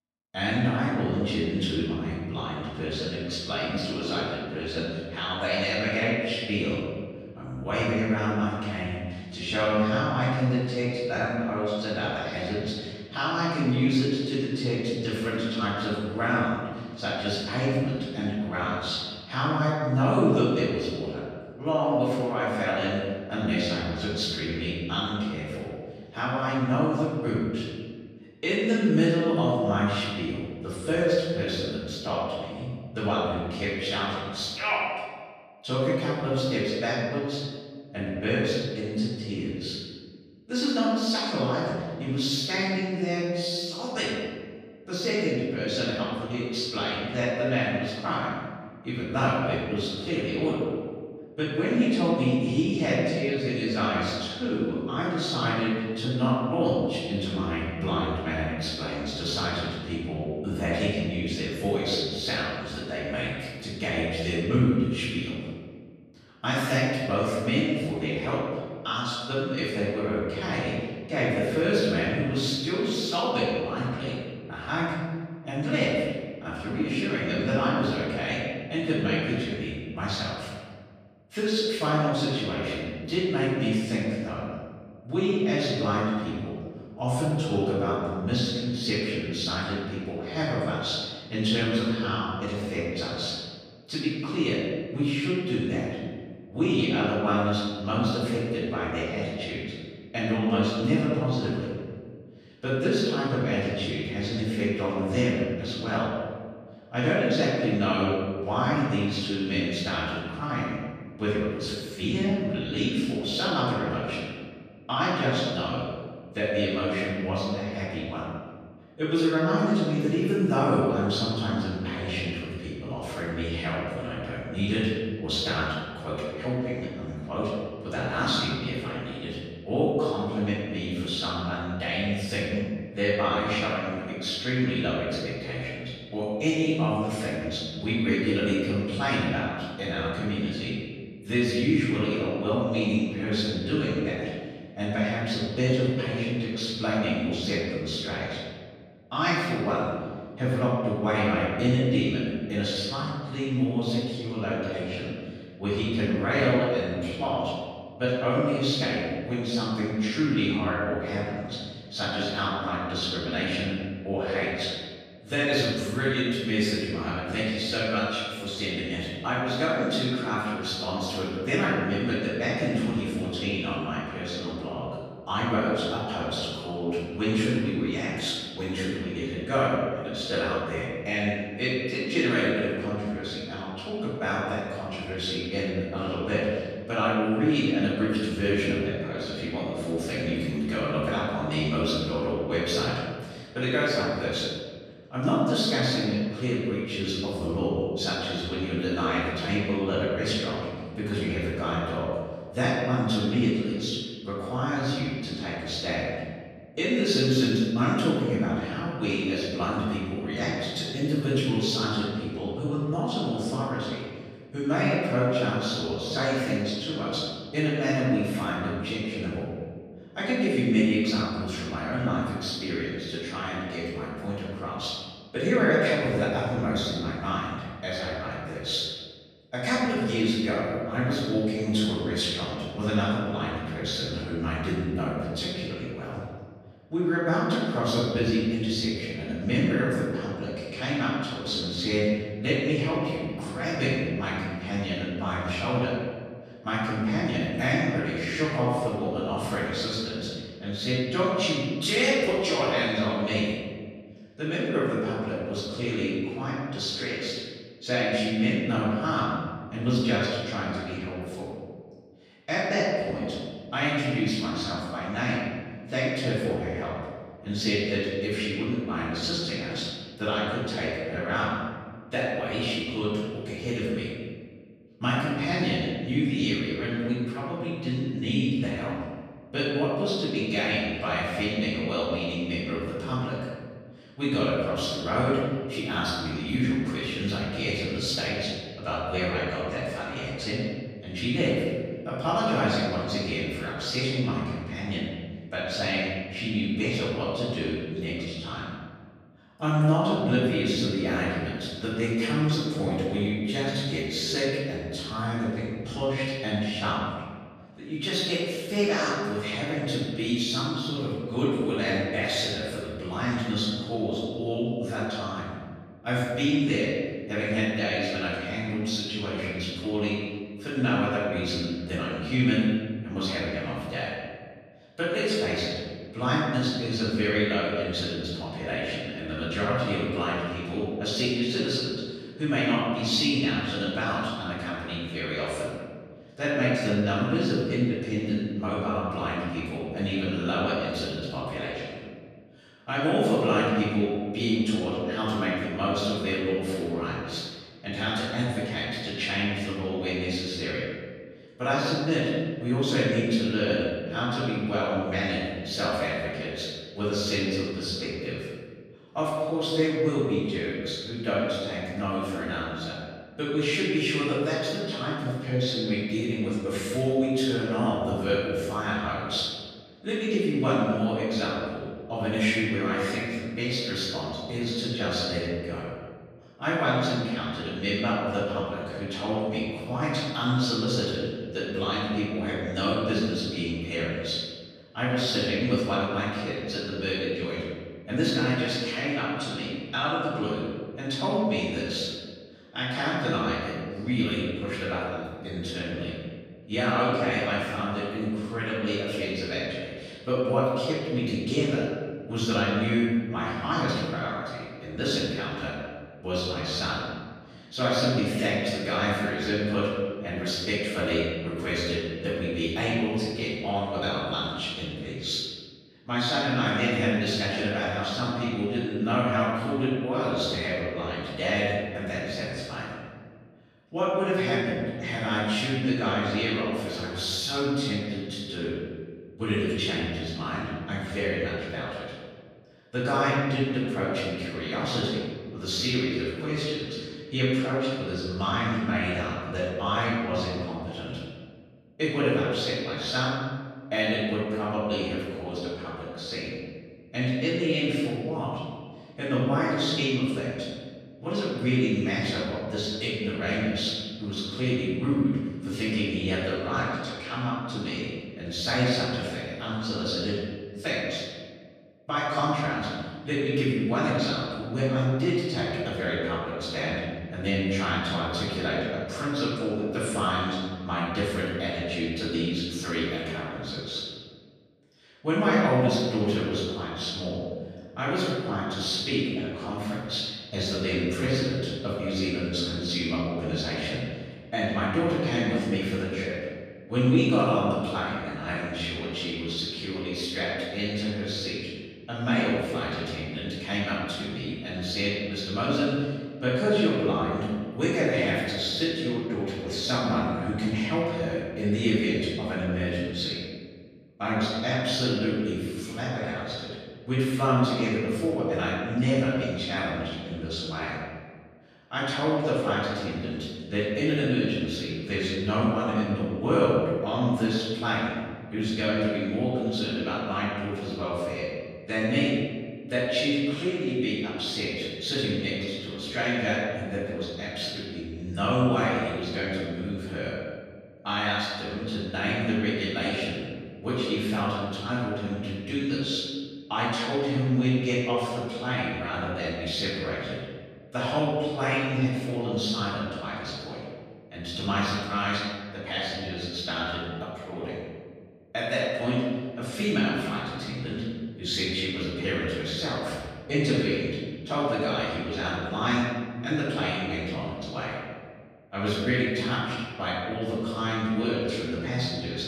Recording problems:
room echo; strong; dies away in 1.6 s
off-mic speech; far

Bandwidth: 15 kHz